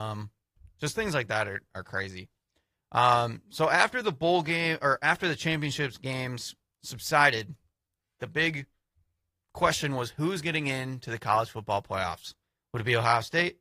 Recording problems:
garbled, watery; slightly; nothing above 15 kHz
abrupt cut into speech; at the start

